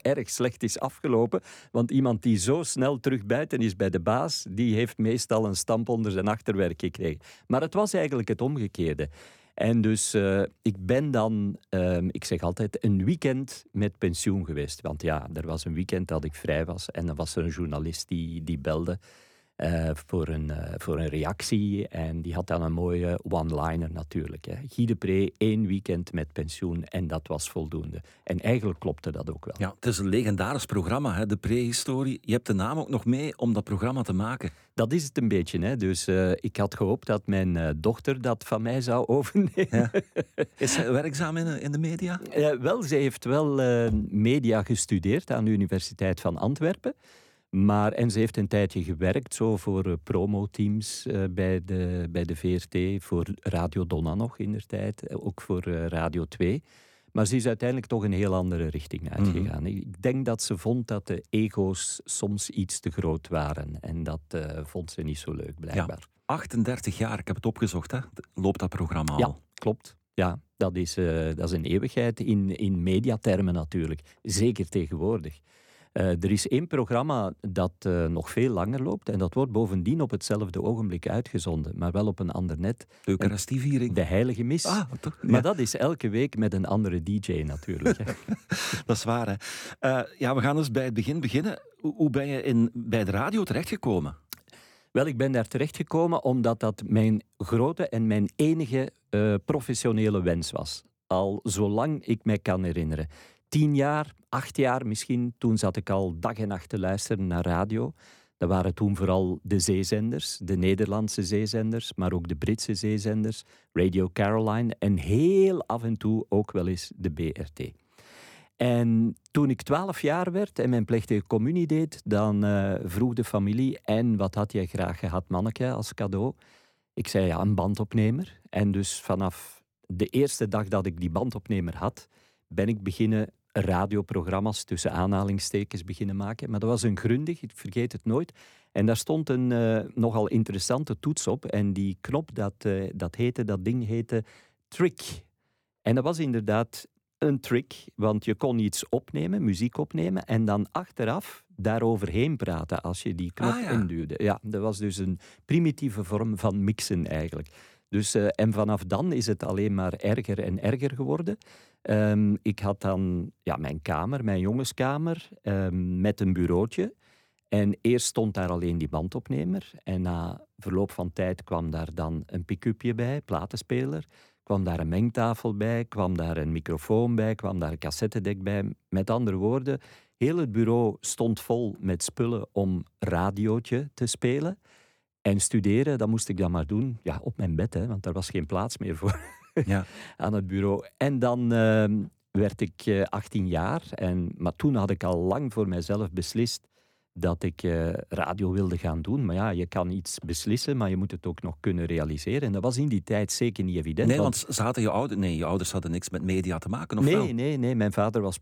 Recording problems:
none

